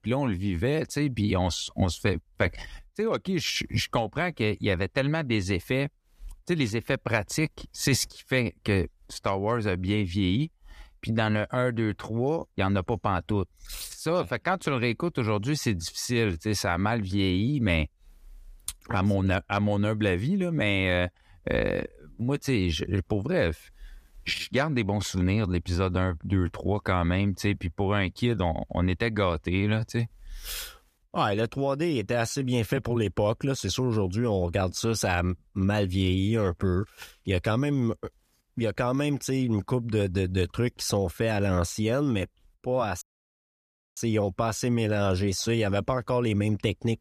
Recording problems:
audio cutting out; at 43 s for 1 s

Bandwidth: 14.5 kHz